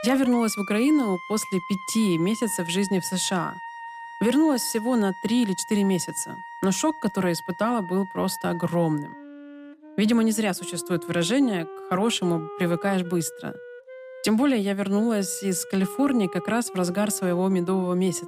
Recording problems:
background music; noticeable; throughout; 15 dB below the speech

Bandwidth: 15 kHz